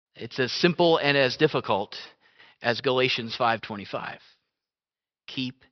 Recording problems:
high frequencies cut off; noticeable; nothing above 5.5 kHz

